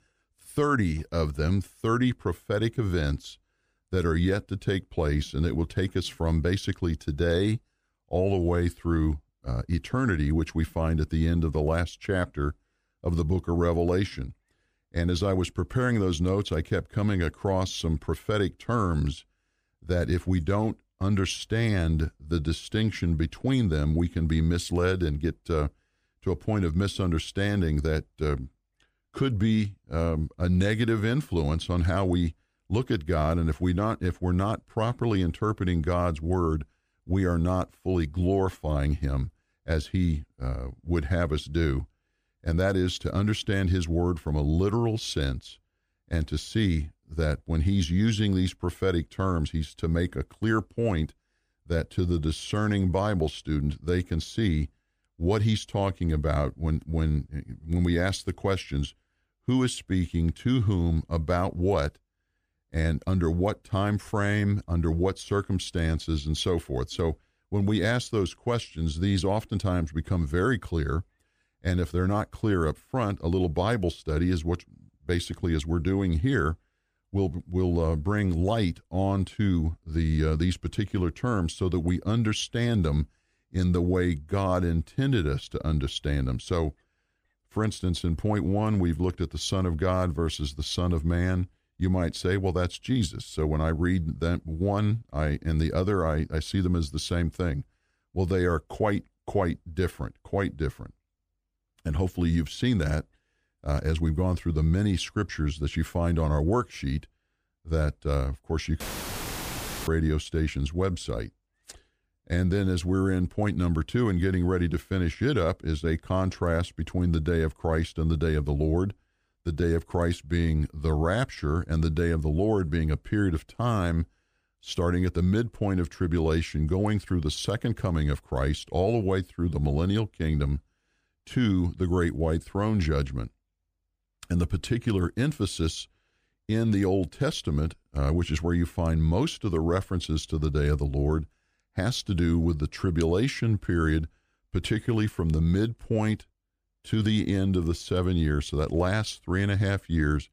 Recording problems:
audio cutting out; filled with static; at 1:49 for 1 s

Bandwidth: 15 kHz